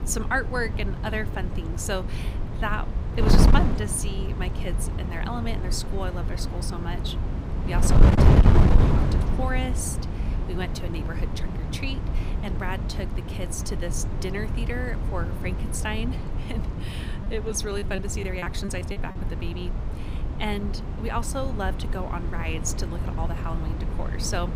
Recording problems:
wind noise on the microphone; heavy; 3 dB below the speech
choppy; very; from 17 to 19 s; 15% of the speech affected

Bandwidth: 15.5 kHz